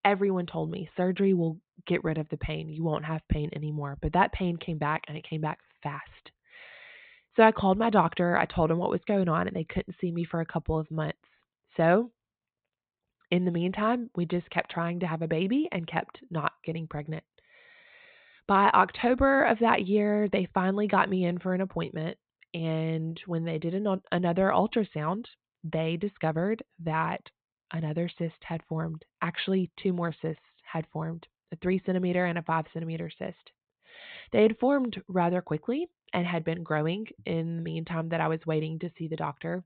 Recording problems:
high frequencies cut off; severe; nothing above 4 kHz

